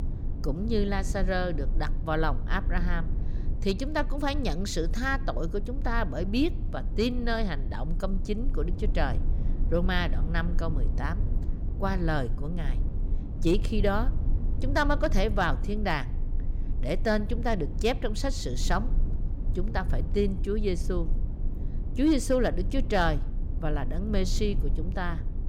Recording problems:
low rumble; noticeable; throughout; 15 dB below the speech

